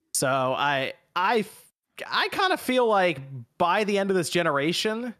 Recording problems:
none

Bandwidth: 13.5 kHz